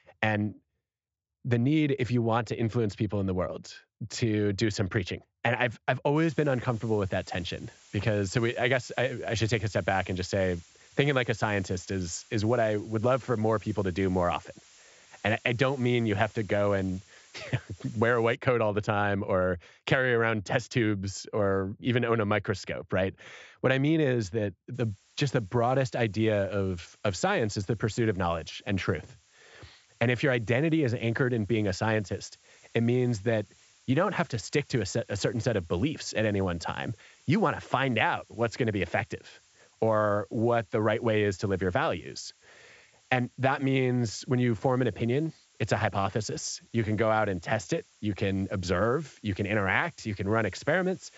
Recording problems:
high frequencies cut off; noticeable; nothing above 8 kHz
hiss; faint; from 6 to 18 s and from 25 s on; 30 dB below the speech

